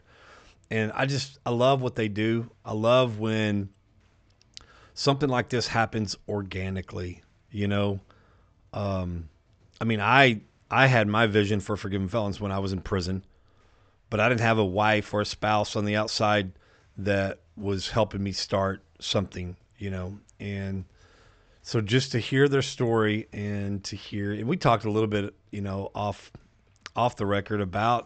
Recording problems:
high frequencies cut off; noticeable; nothing above 8 kHz

